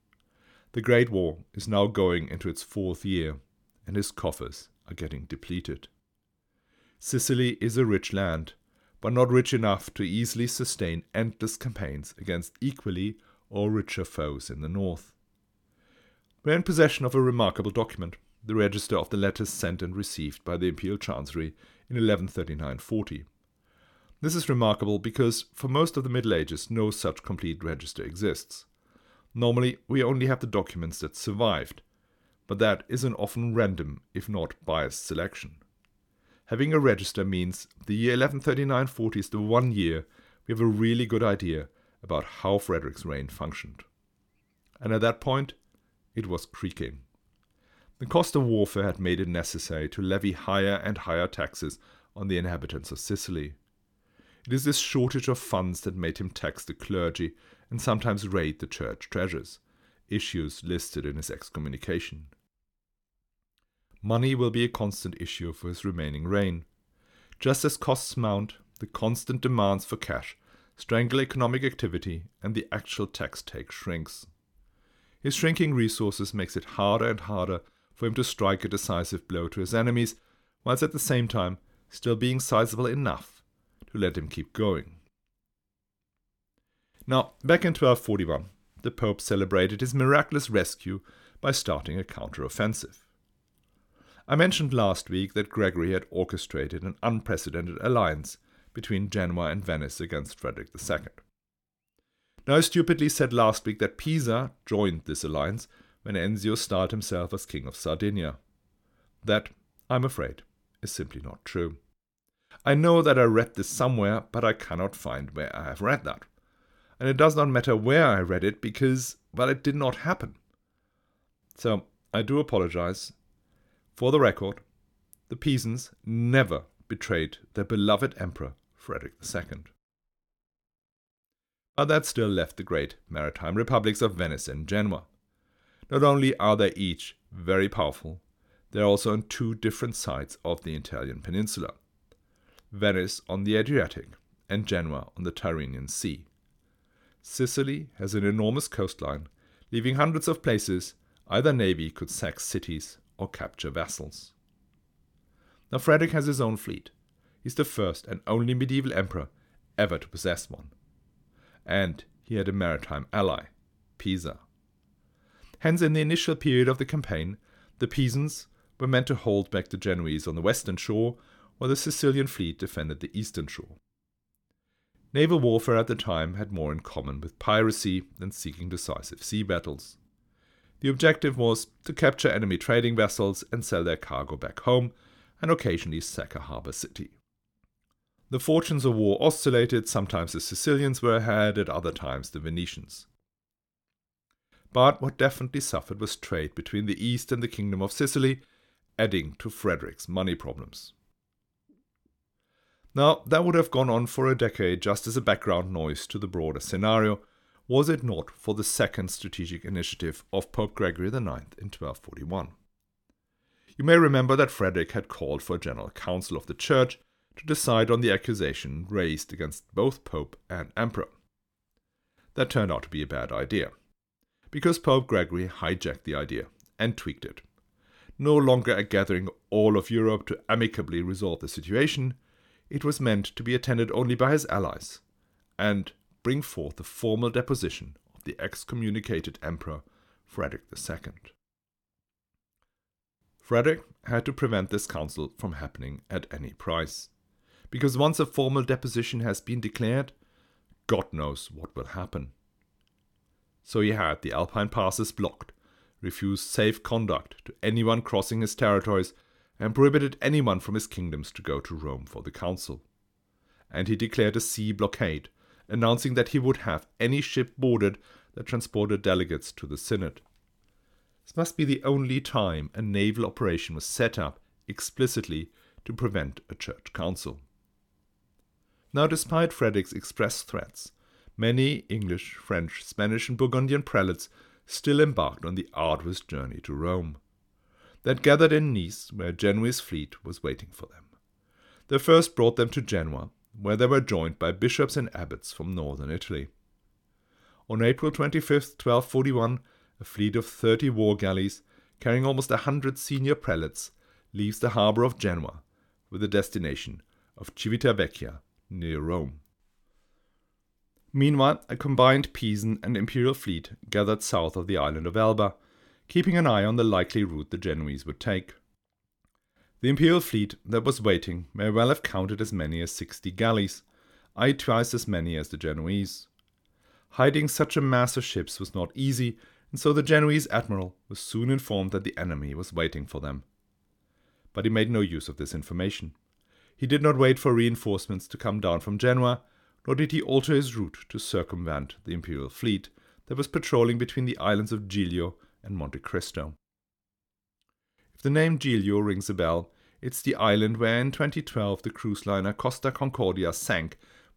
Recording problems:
none

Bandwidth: 18 kHz